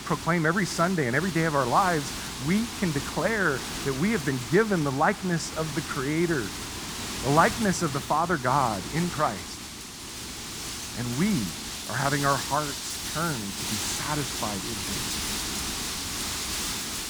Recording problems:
wind noise on the microphone; heavy; 7 dB below the speech

